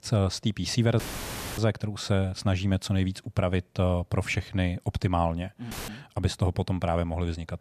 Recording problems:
audio cutting out; filled with static; at 1 s for 0.5 s and at 5.5 s

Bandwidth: 14.5 kHz